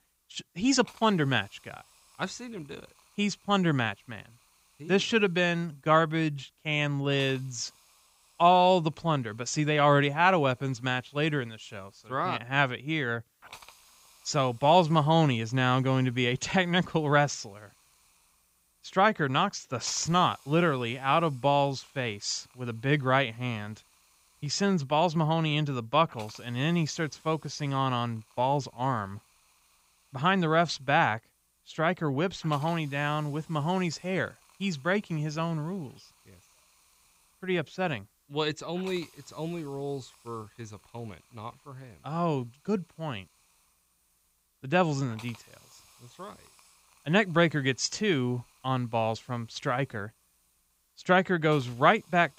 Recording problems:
high frequencies cut off; noticeable; nothing above 8 kHz
hiss; faint; throughout; 30 dB below the speech

